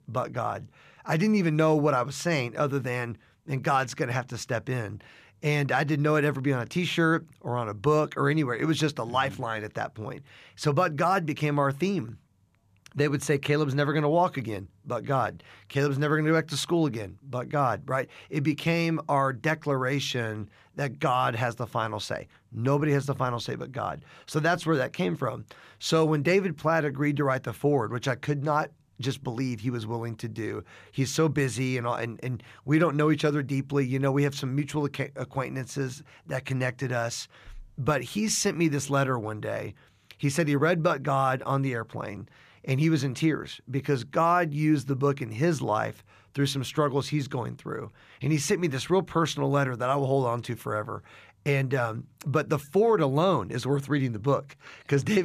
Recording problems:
abrupt cut into speech; at the end

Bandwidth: 14.5 kHz